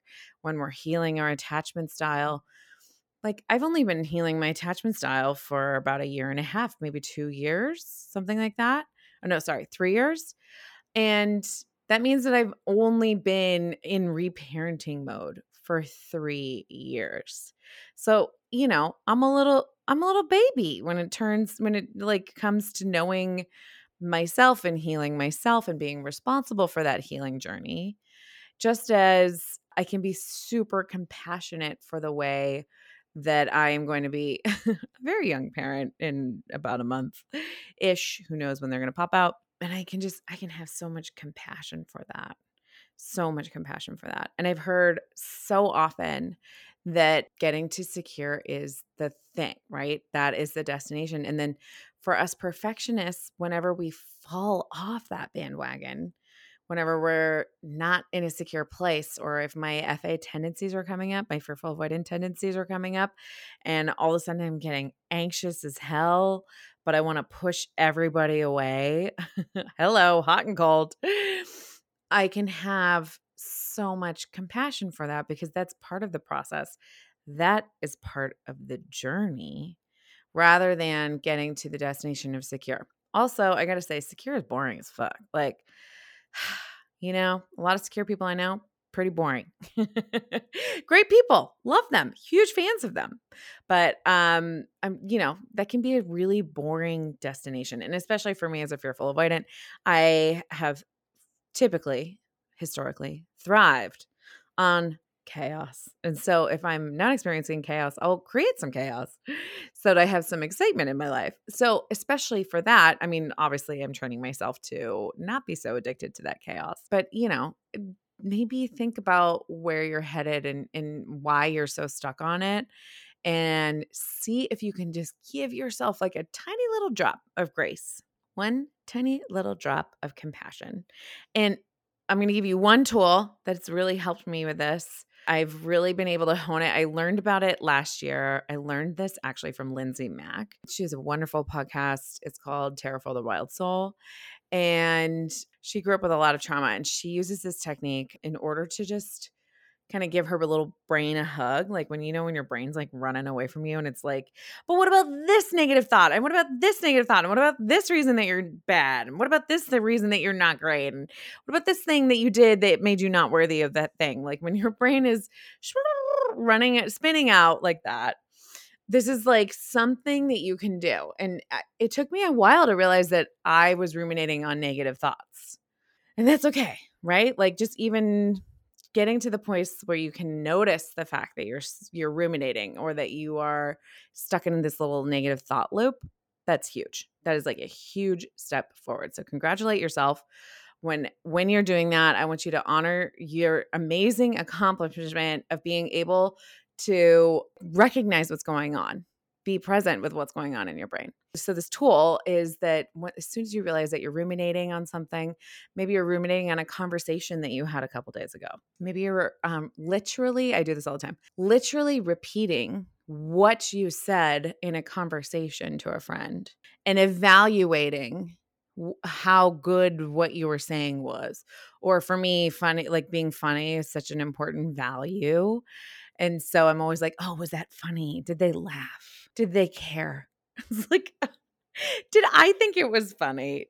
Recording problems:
none

